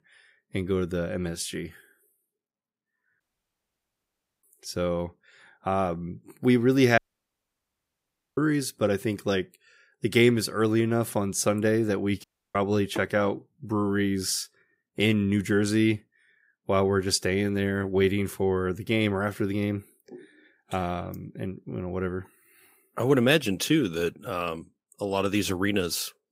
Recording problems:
audio cutting out; at 3 s for 1 s, at 7 s for 1.5 s and at 12 s

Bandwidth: 15.5 kHz